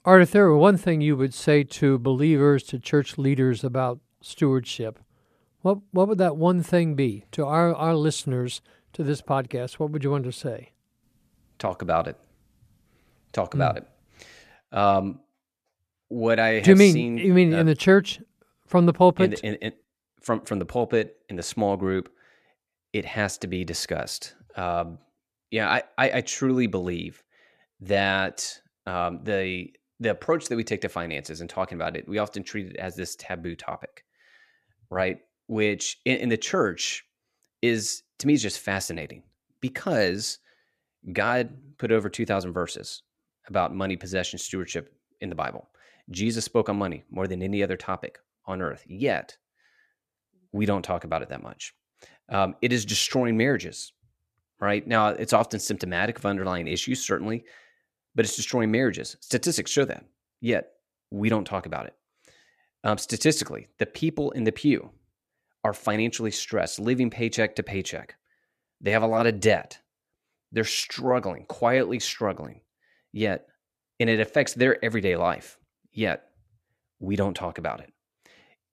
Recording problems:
none

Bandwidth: 14.5 kHz